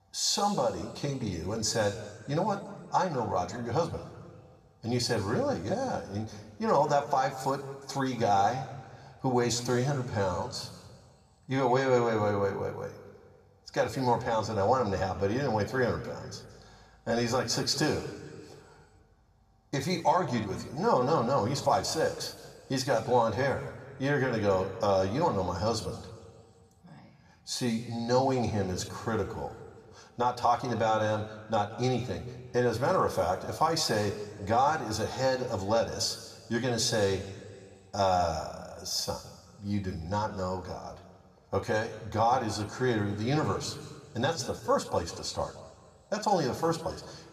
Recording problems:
room echo; slight; dies away in 1.5 s
off-mic speech; somewhat distant

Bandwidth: 14.5 kHz